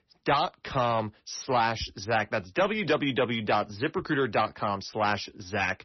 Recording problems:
distortion; slight; 10 dB below the speech
garbled, watery; slightly; nothing above 6 kHz

